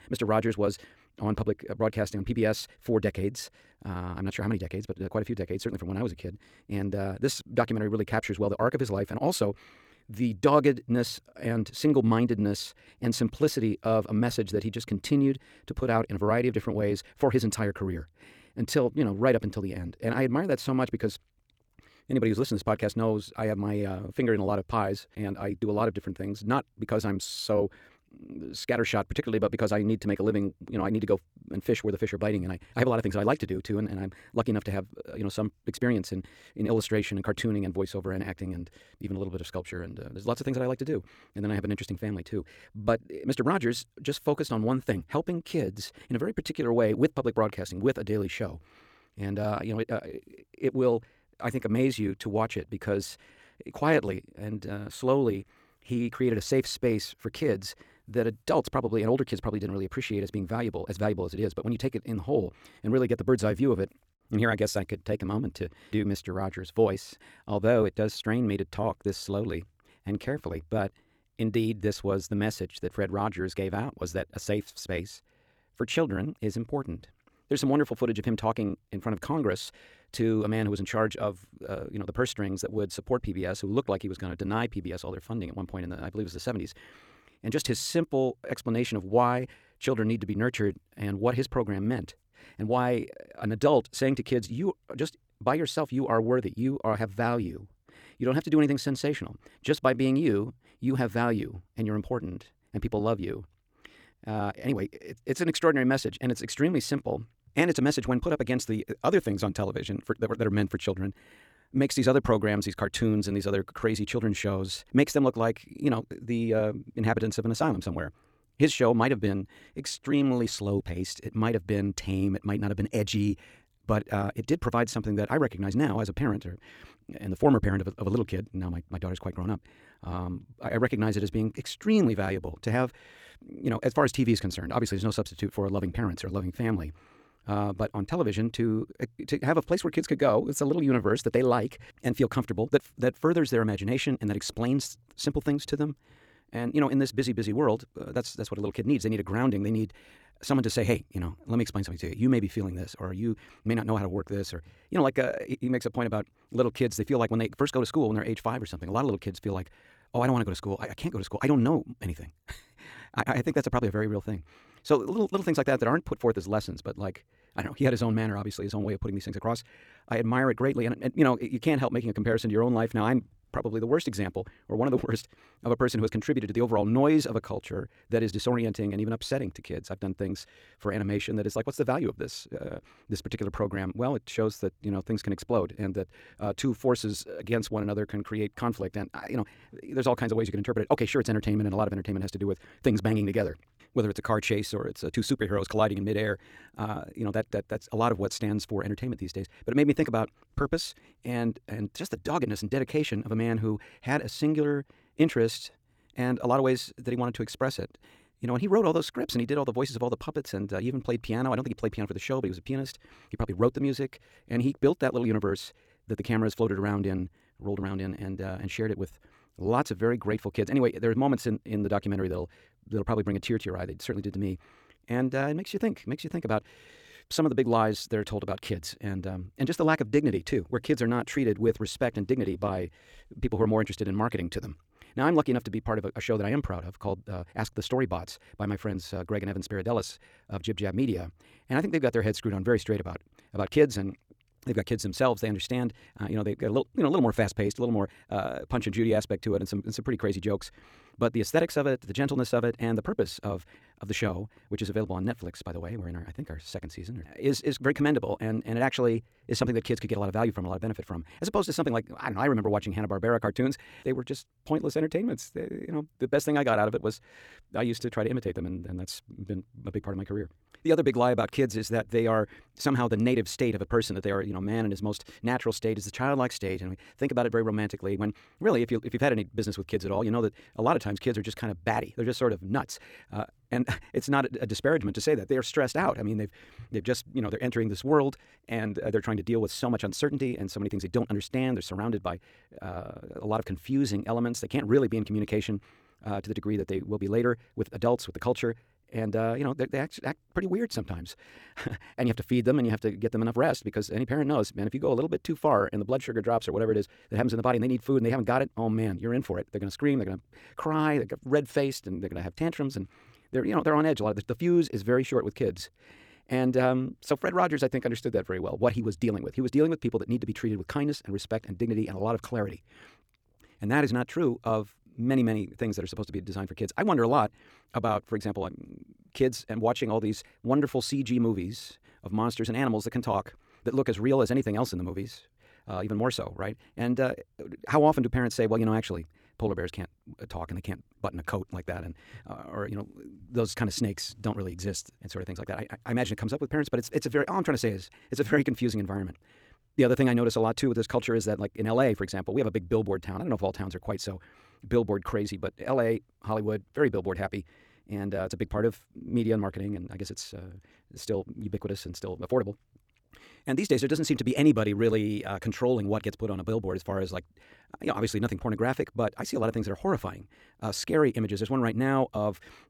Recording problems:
wrong speed, natural pitch; too fast; 1.5 times normal speed

